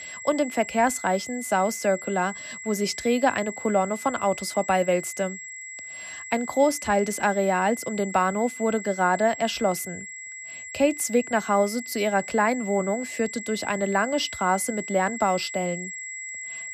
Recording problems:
high-pitched whine; noticeable; throughout; 2 kHz, 10 dB below the speech

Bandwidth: 14.5 kHz